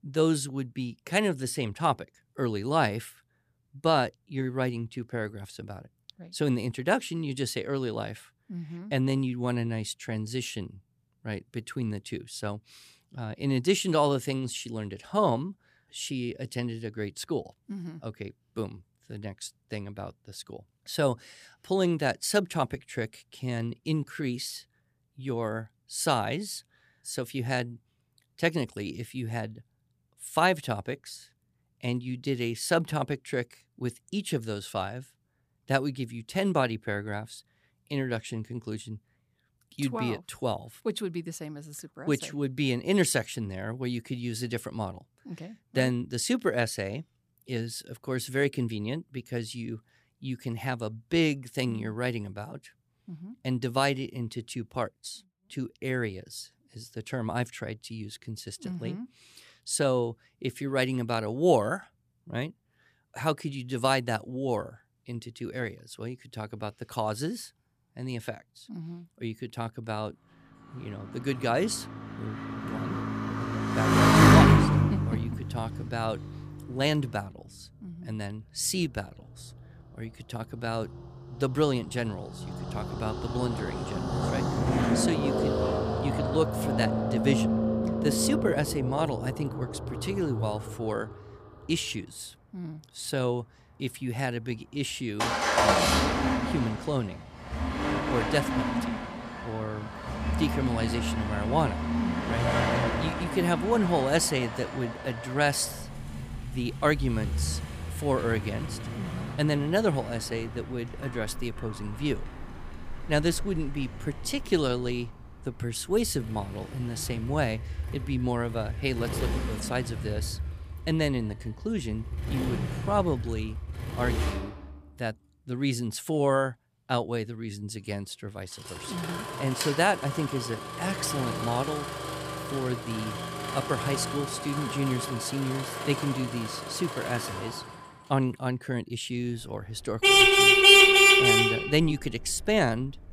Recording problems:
traffic noise; very loud; from 1:11 on; 5 dB above the speech

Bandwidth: 15 kHz